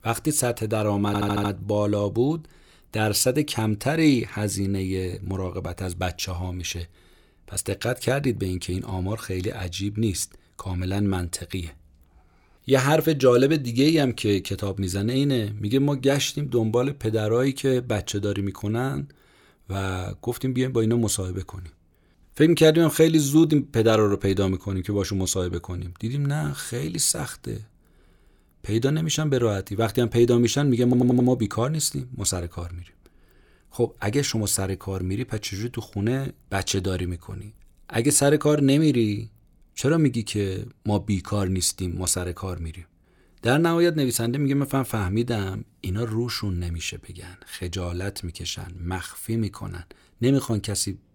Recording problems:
audio stuttering; at 1 s and at 31 s

